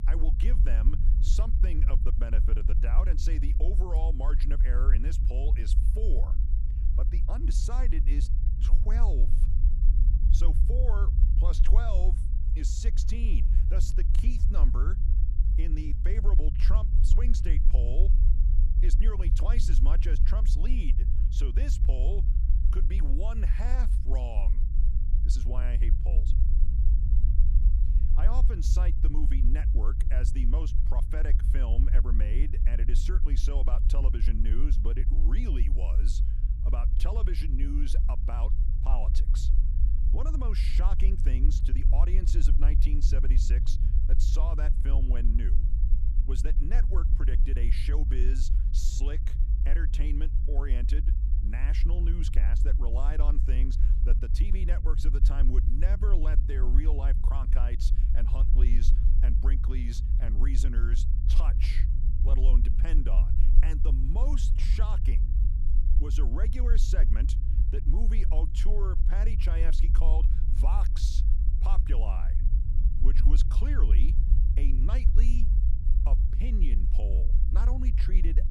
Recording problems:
low rumble; loud; throughout; 5 dB below the speech

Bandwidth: 15 kHz